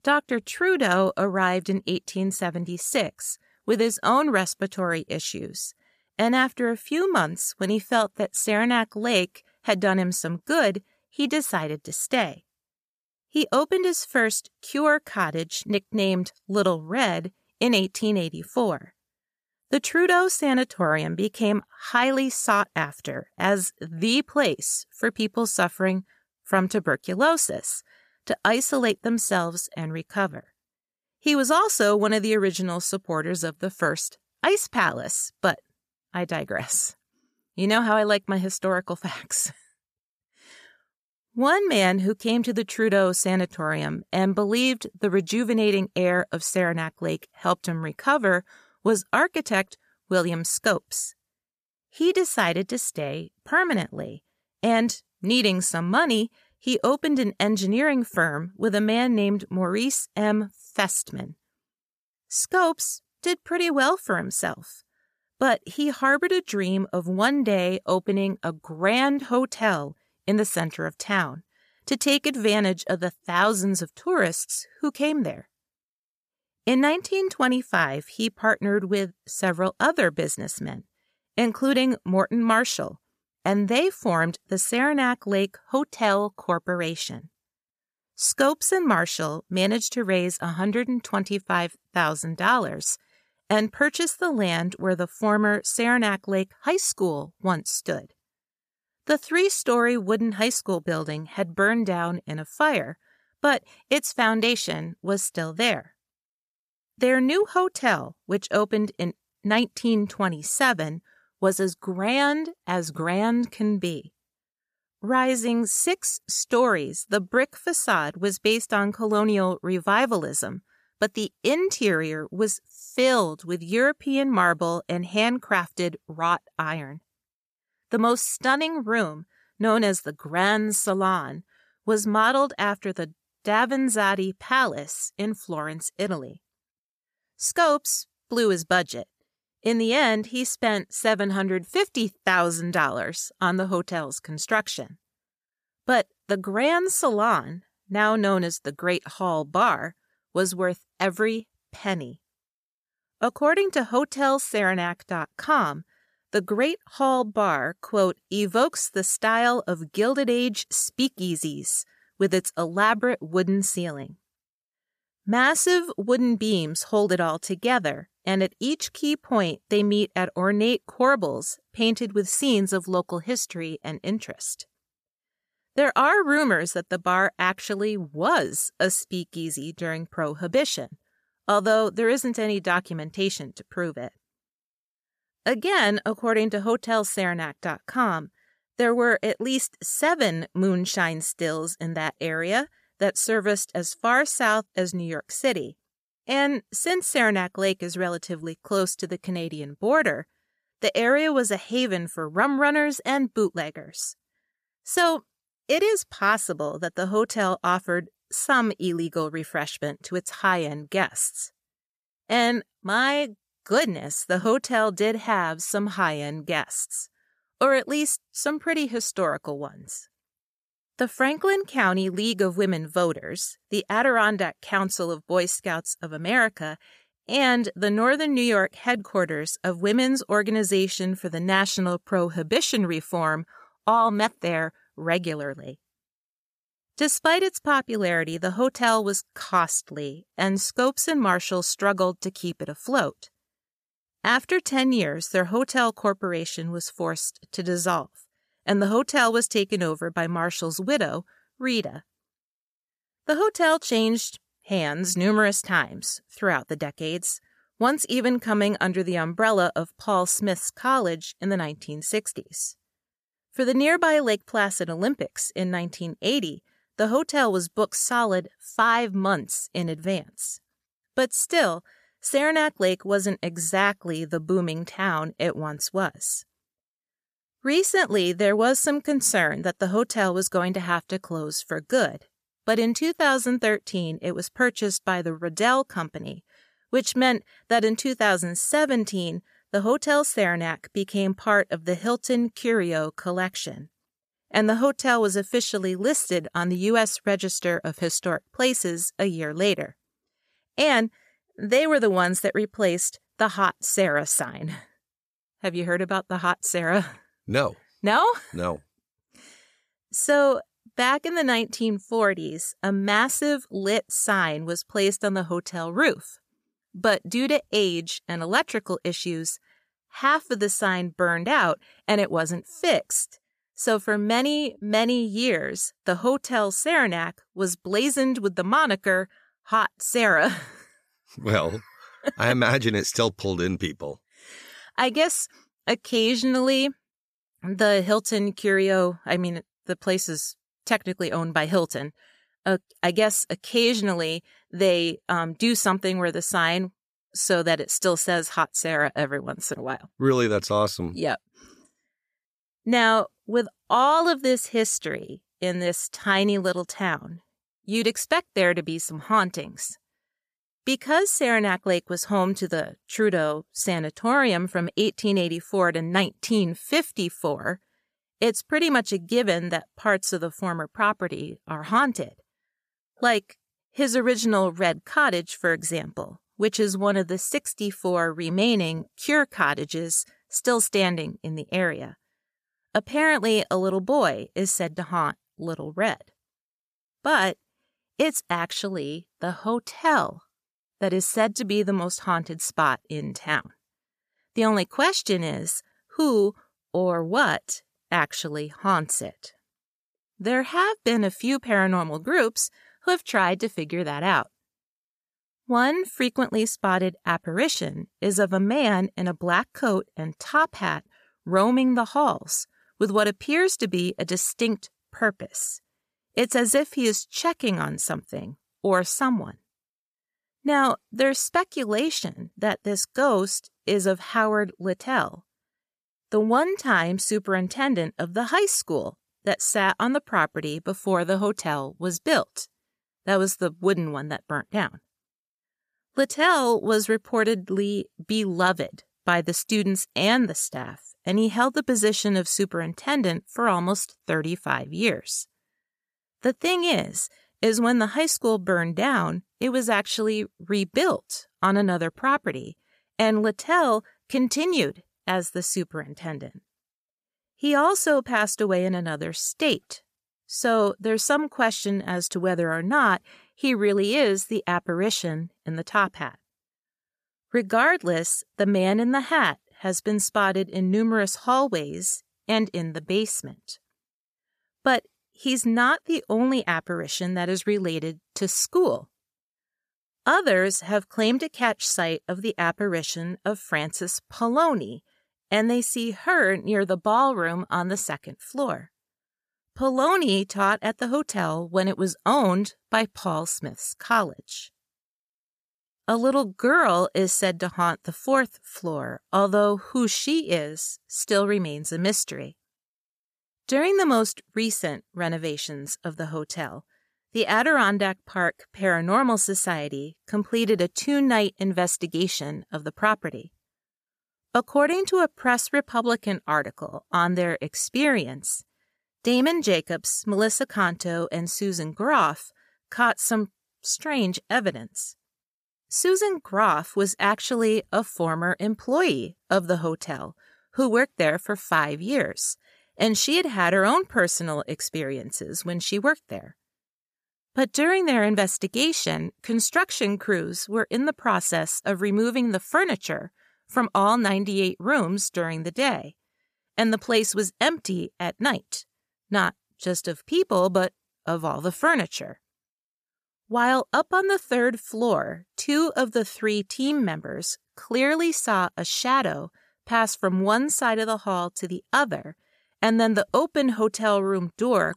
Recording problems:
none

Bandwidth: 14.5 kHz